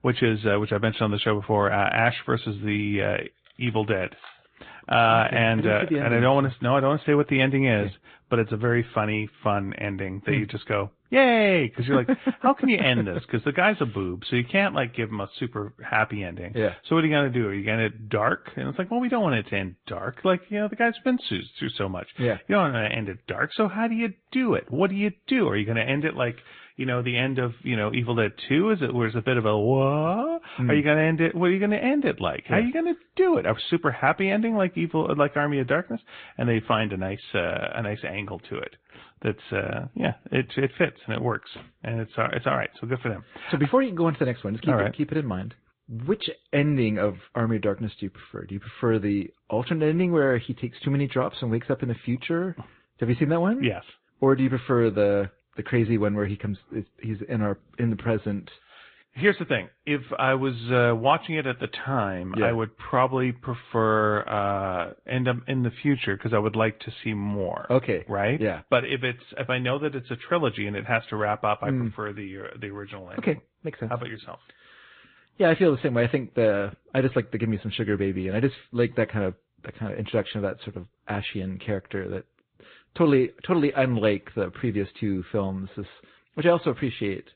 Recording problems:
high frequencies cut off; severe; nothing above 4 kHz
garbled, watery; slightly

